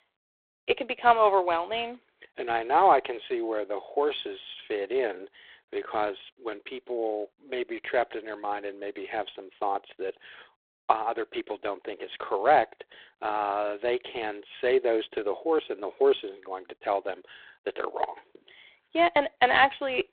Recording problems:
phone-call audio; poor line

